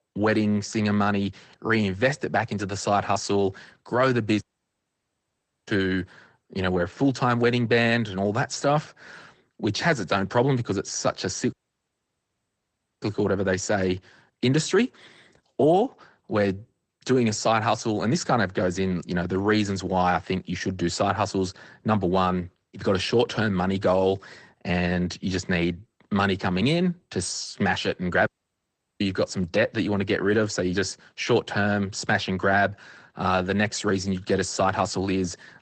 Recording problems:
garbled, watery; slightly; nothing above 8.5 kHz
audio cutting out; at 4.5 s for 1.5 s, at 12 s for 1.5 s and at 28 s for 0.5 s

